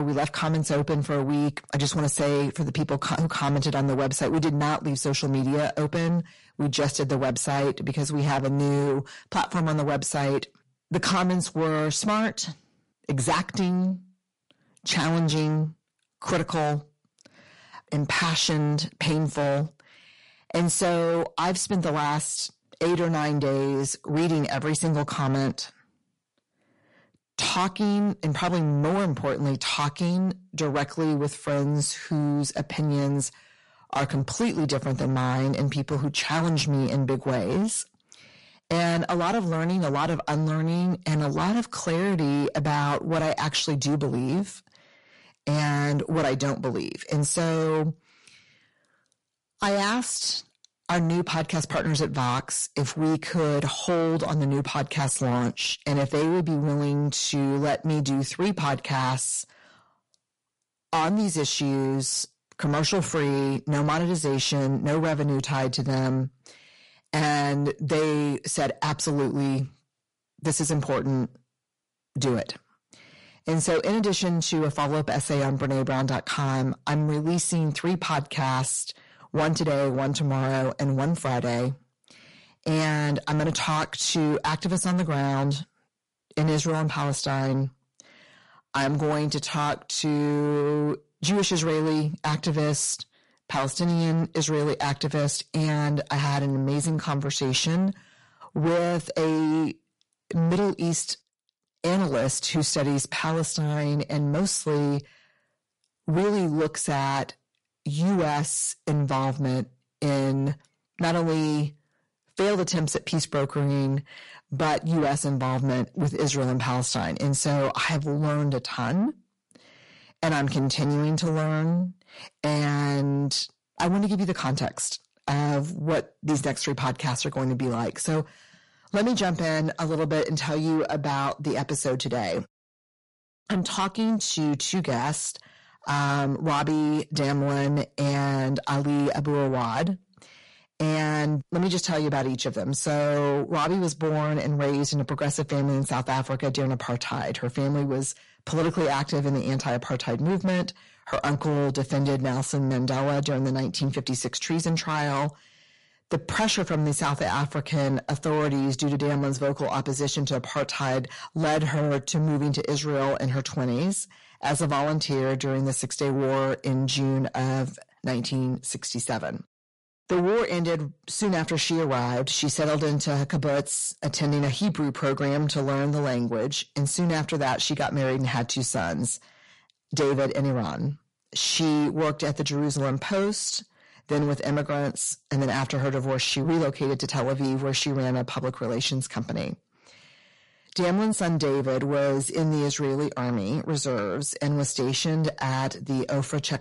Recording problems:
distortion; heavy; 7 dB below the speech
garbled, watery; slightly; nothing above 11 kHz
abrupt cut into speech; at the start

